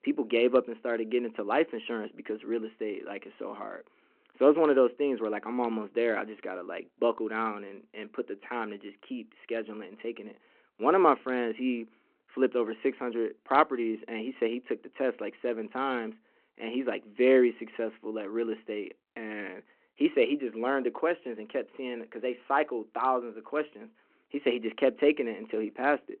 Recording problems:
phone-call audio

